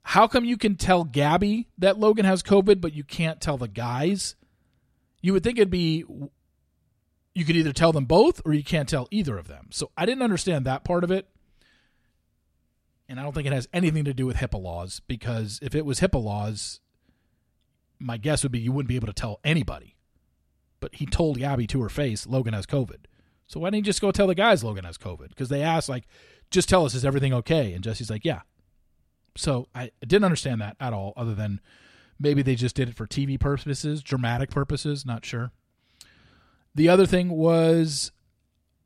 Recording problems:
none

